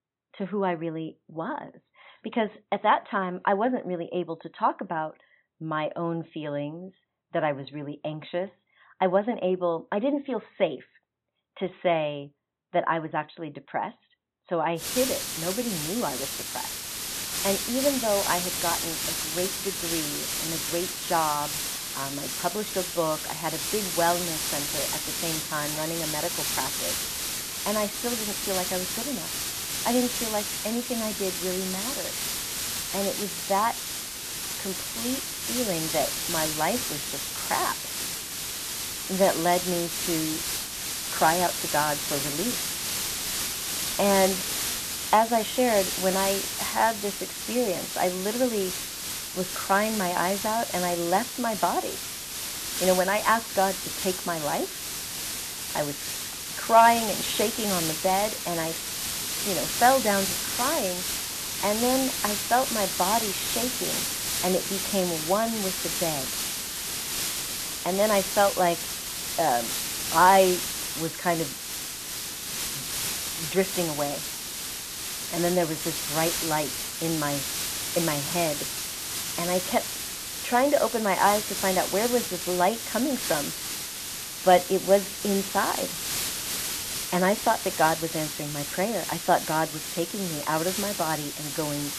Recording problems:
high frequencies cut off; severe; nothing above 4 kHz
hiss; loud; from 15 s on; 1 dB below the speech

